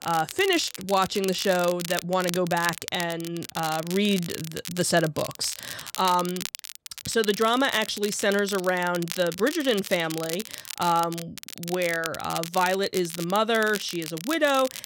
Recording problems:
crackle, like an old record; noticeable; 10 dB below the speech

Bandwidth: 16.5 kHz